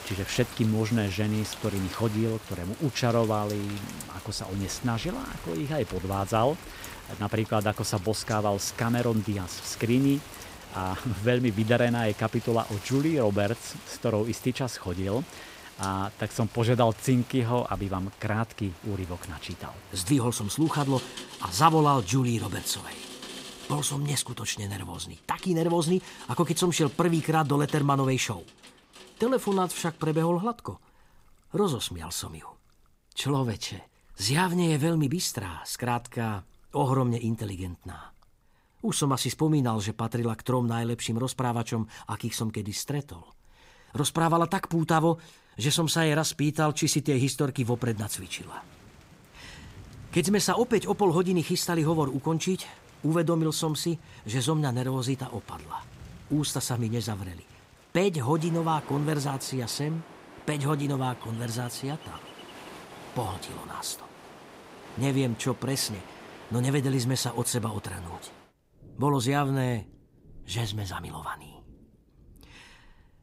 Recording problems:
rain or running water; noticeable; throughout; 15 dB below the speech

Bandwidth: 15.5 kHz